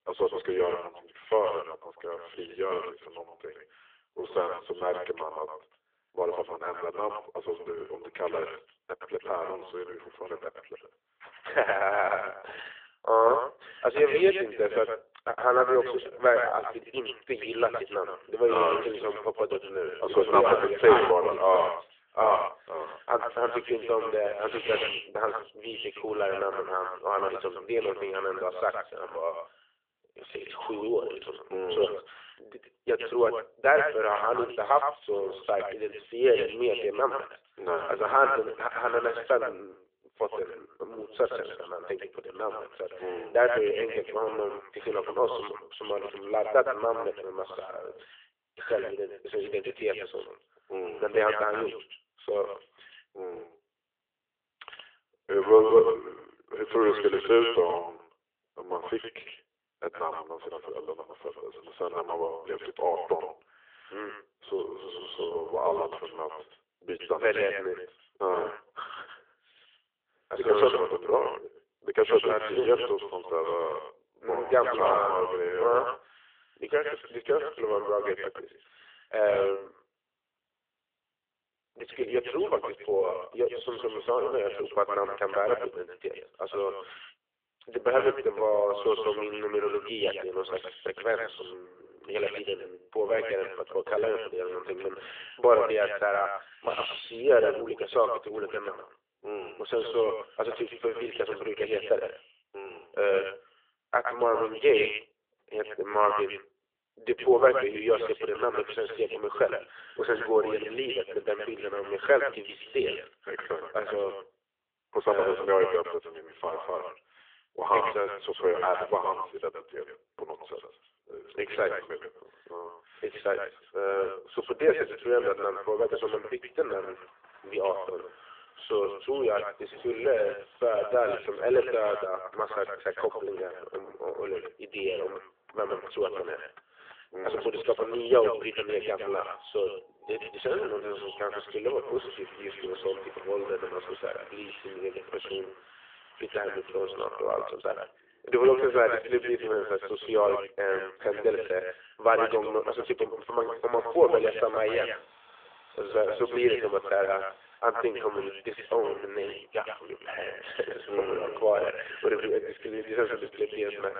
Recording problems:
echo of what is said; strong; throughout; 110 ms later, 8 dB below the speech
phone-call audio
traffic noise; faint; from 2:04 on; 25 dB below the speech

